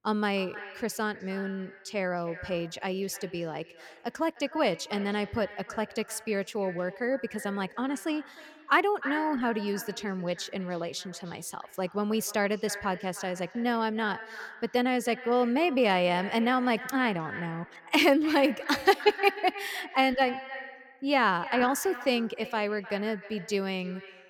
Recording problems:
echo of what is said; noticeable; throughout; 310 ms later, 15 dB below the speech

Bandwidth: 17 kHz